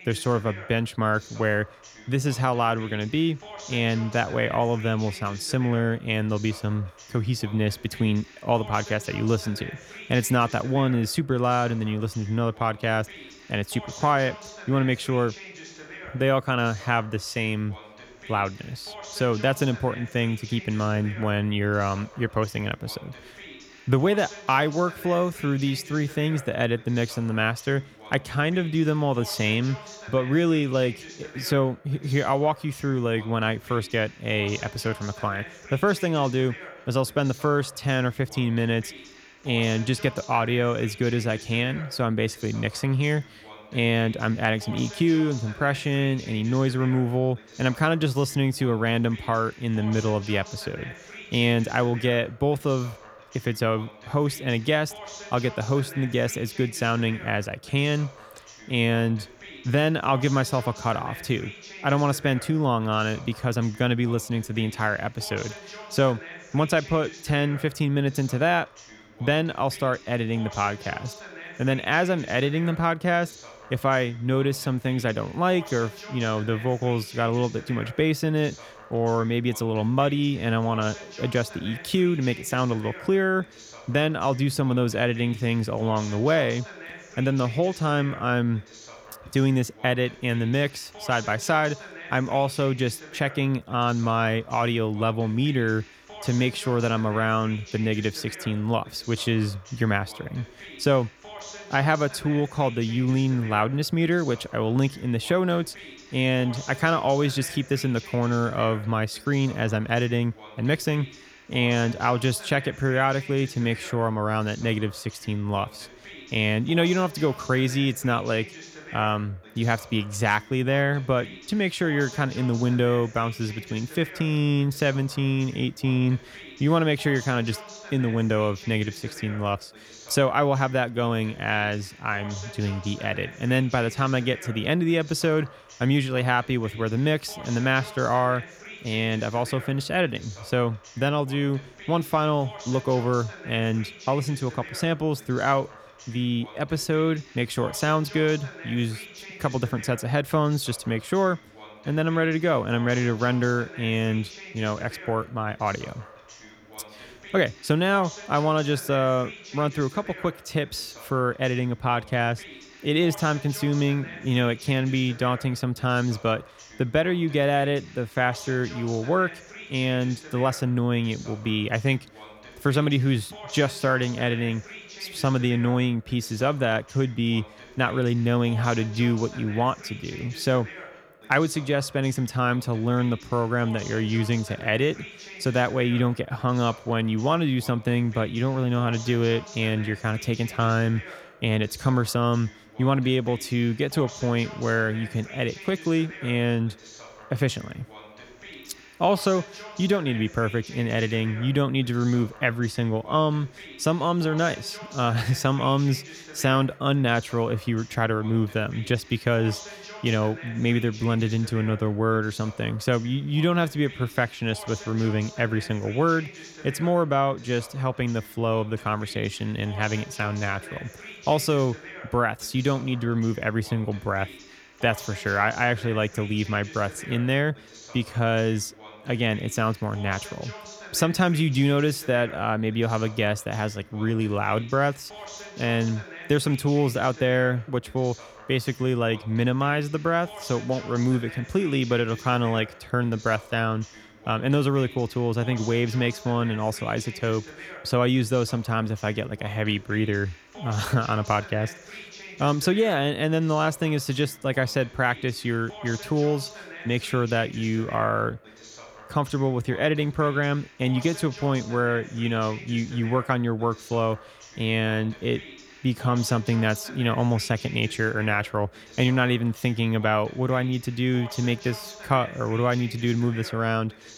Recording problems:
voice in the background; noticeable; throughout; 15 dB below the speech

